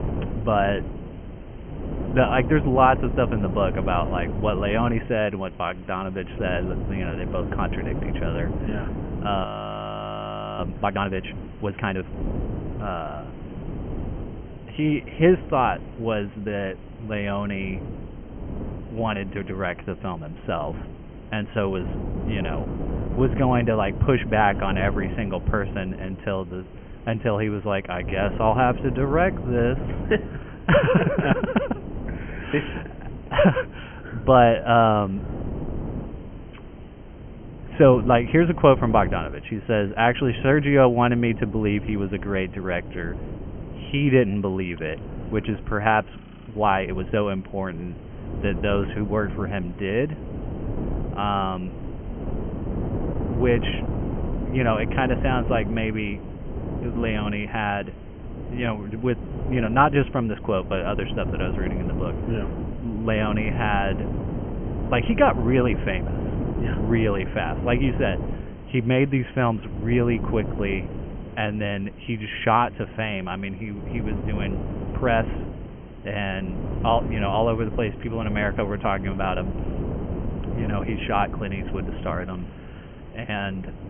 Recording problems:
high frequencies cut off; severe; nothing above 3 kHz
wind noise on the microphone; occasional gusts; 15 dB below the speech
hiss; faint; throughout; 25 dB below the speech
audio freezing; at 9.5 s for 1 s and at 46 s

